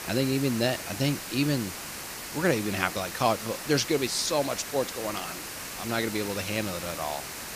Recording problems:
hiss; loud; throughout; 7 dB below the speech

